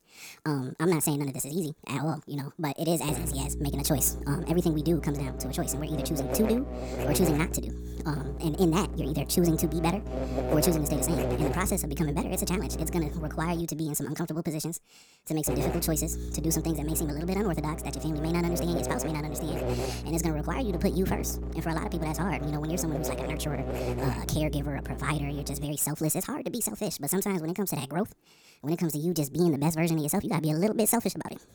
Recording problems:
wrong speed and pitch; too fast and too high; 1.6 times normal speed
electrical hum; loud; from 3 to 14 s and from 15 to 26 s; 60 Hz, 6 dB below the speech

